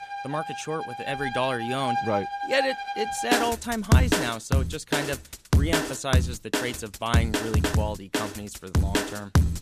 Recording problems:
background music; very loud; throughout; 3 dB above the speech

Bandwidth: 14.5 kHz